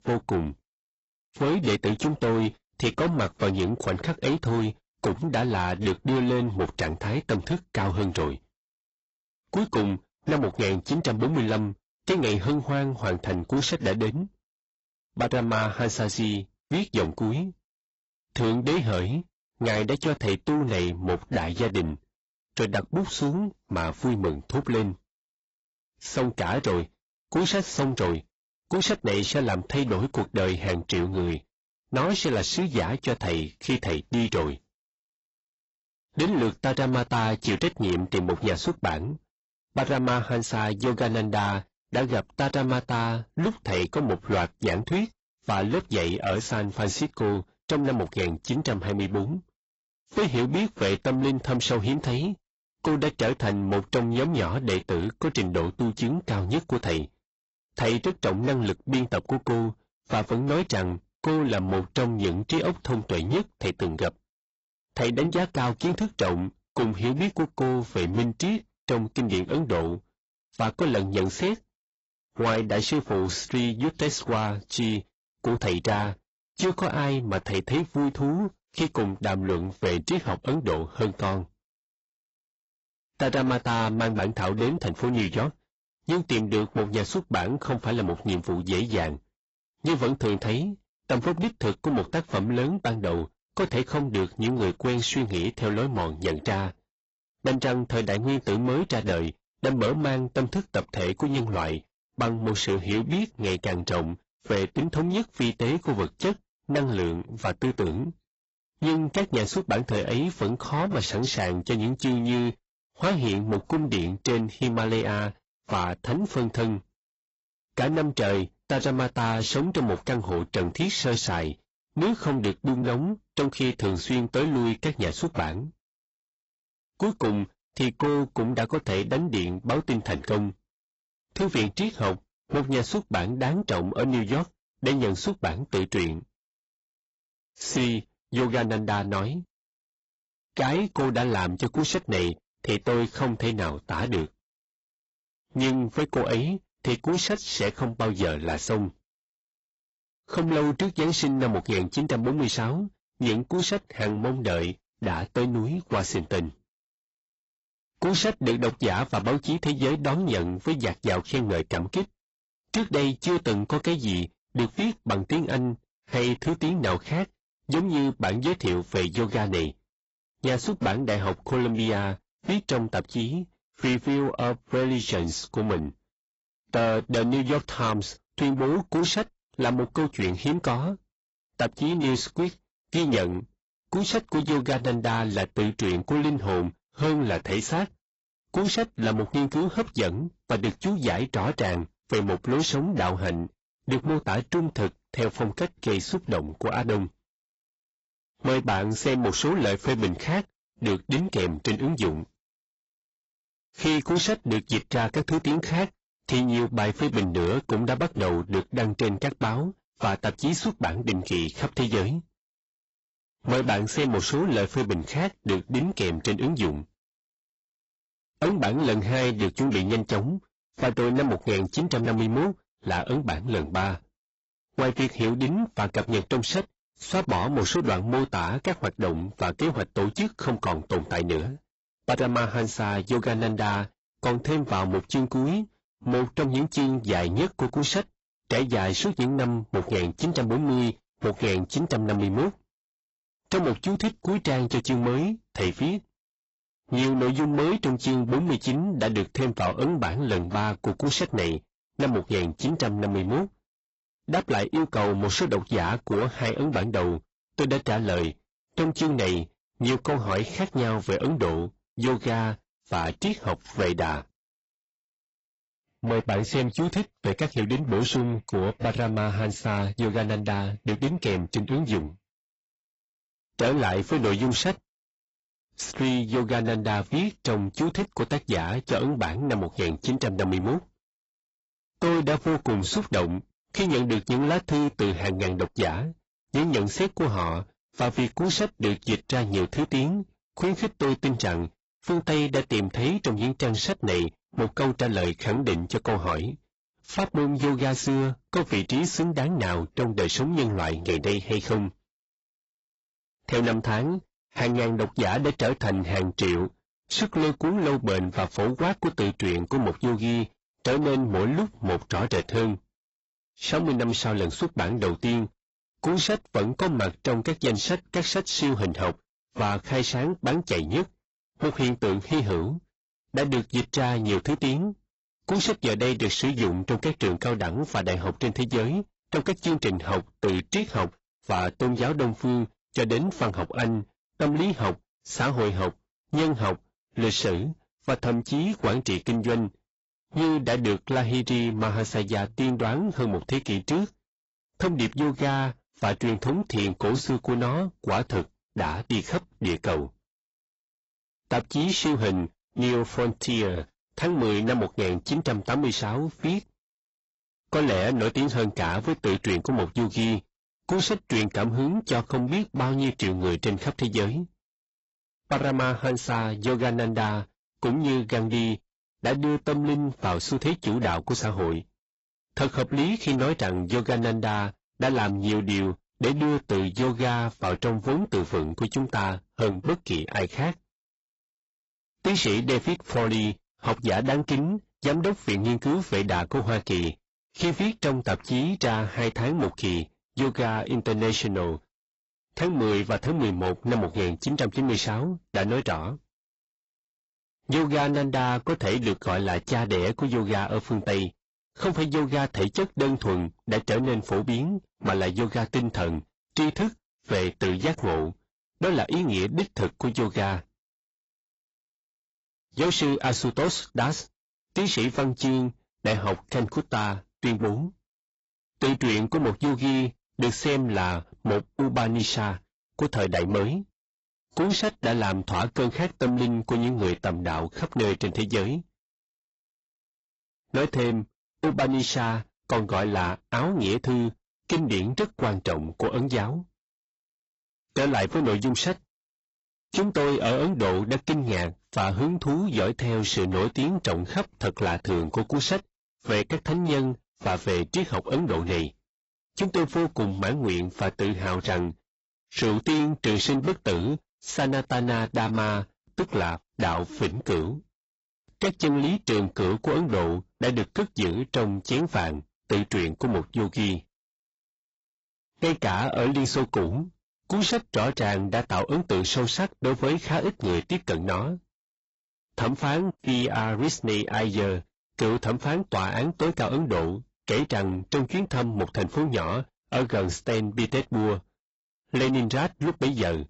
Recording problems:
distortion; heavy; 7 dB below the speech
garbled, watery; badly; nothing above 7.5 kHz

